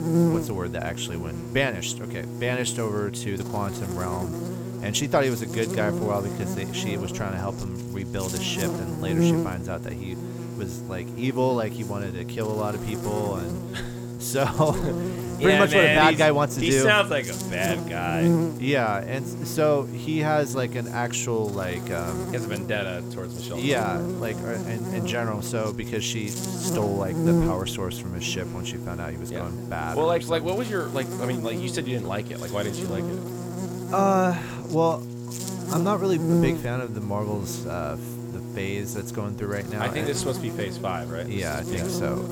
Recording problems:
electrical hum; loud; throughout; 60 Hz, 8 dB below the speech

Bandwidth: 17 kHz